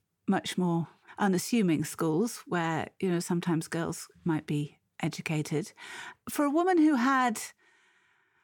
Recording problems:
none

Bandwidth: 18.5 kHz